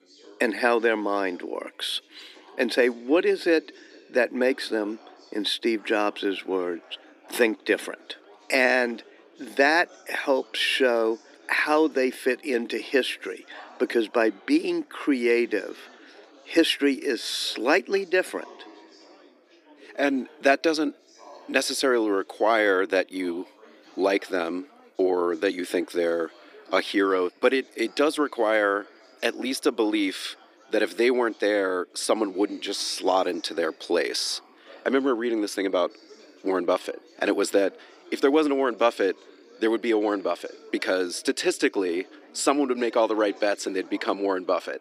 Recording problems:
thin; somewhat; fading below 300 Hz
background chatter; faint; throughout; 4 voices, 25 dB below the speech

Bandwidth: 15 kHz